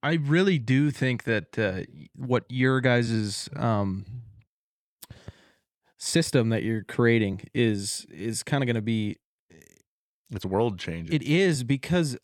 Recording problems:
uneven, jittery; strongly; from 0.5 to 12 s

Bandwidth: 17.5 kHz